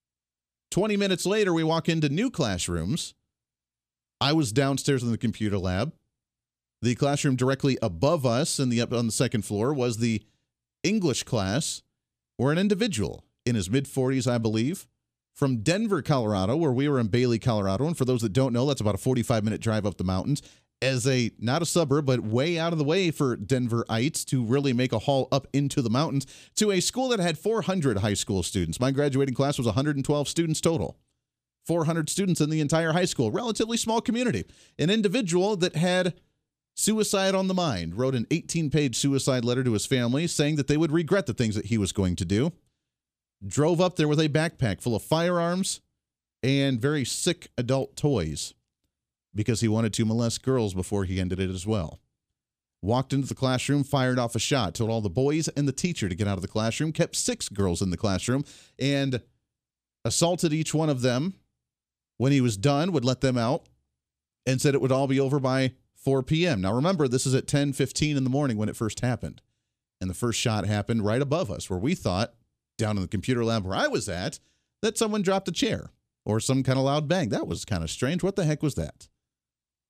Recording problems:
none

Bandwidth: 14.5 kHz